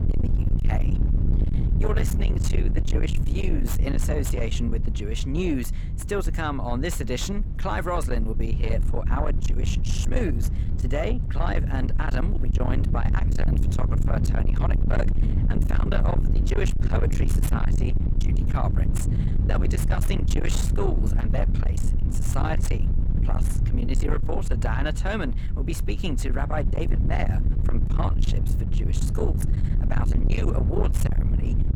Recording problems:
distortion; heavy; 7 dB below the speech
low rumble; loud; throughout; 6 dB below the speech

